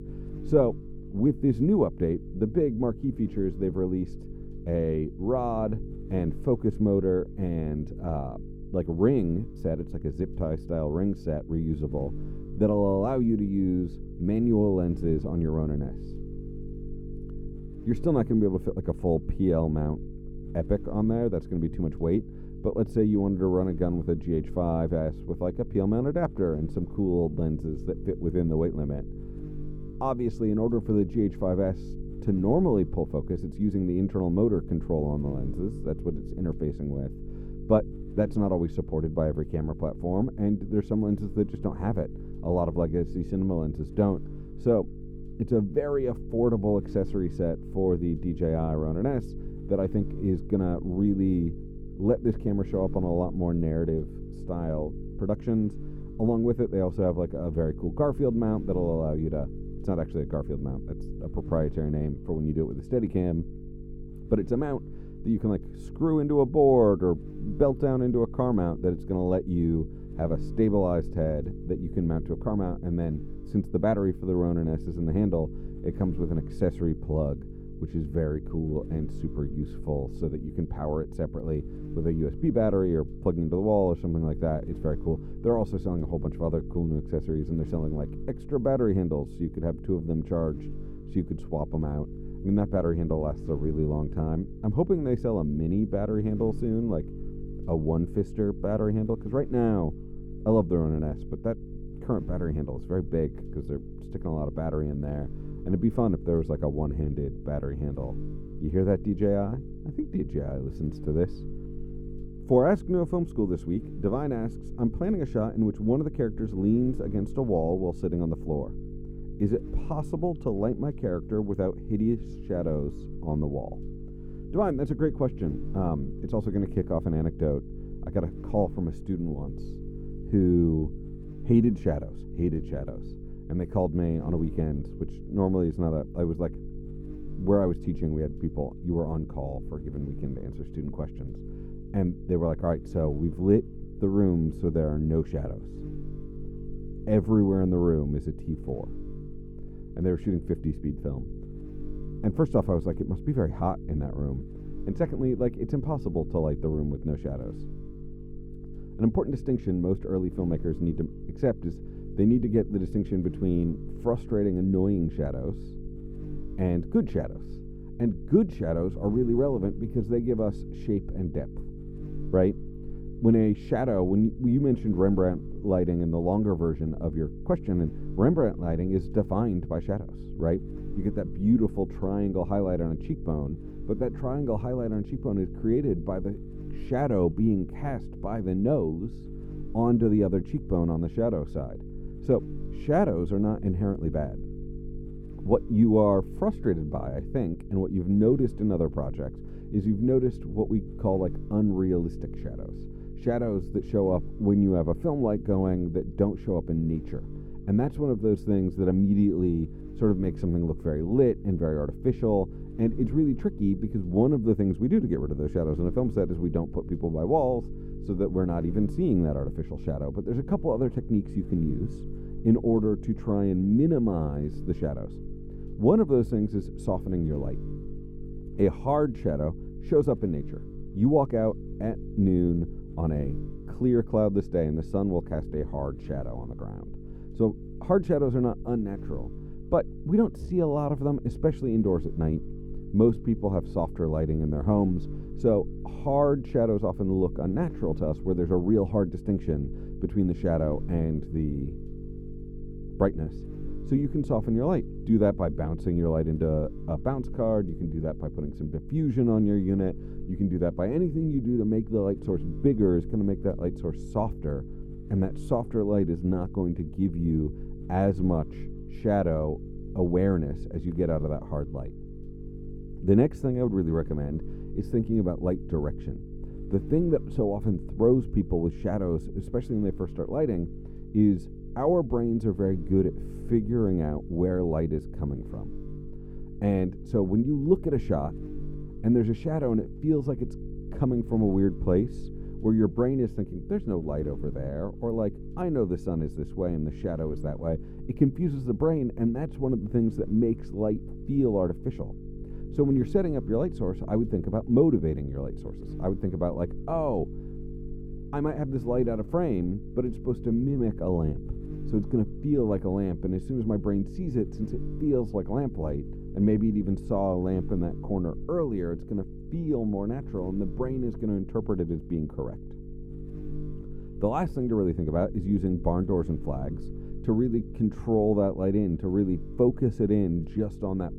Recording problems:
muffled; very; fading above 1 kHz
electrical hum; noticeable; throughout; 50 Hz, 15 dB below the speech

